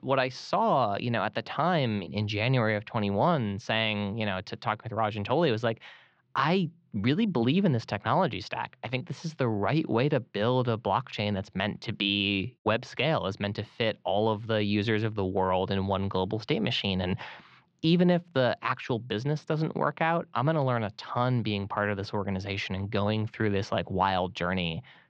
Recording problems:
muffled; very slightly; fading above 4.5 kHz

